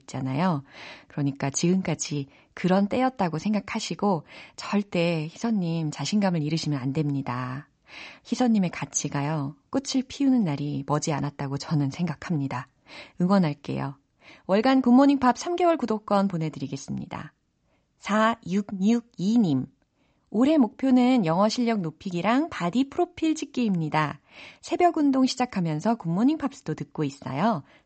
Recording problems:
high frequencies cut off; noticeable; nothing above 8 kHz

